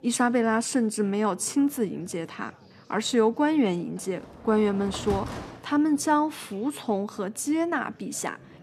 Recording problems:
chatter from many people; faint; throughout; 25 dB below the speech
door banging; noticeable; from 4 to 5.5 s; peak 8 dB below the speech

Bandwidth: 13.5 kHz